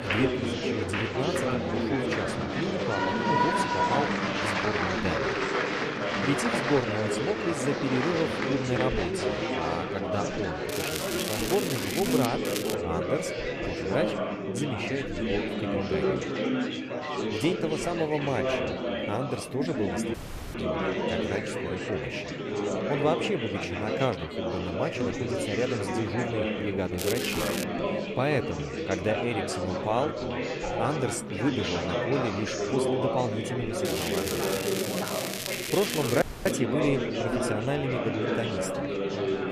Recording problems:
chatter from many people; very loud; throughout; 2 dB above the speech
crackling; loud; 4 times, first at 11 s; 3 dB below the speech
audio cutting out; at 20 s and at 36 s

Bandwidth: 14.5 kHz